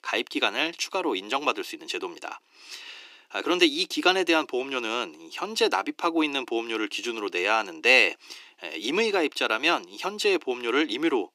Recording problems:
thin; very; fading below 300 Hz

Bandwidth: 15 kHz